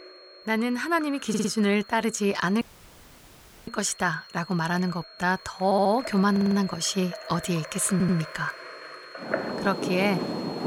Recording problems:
high-pitched whine; noticeable; throughout; 4.5 kHz, 20 dB below the speech
rain or running water; noticeable; throughout; 10 dB below the speech
audio stuttering; 4 times, first at 1.5 s
audio cutting out; at 2.5 s for 1 s

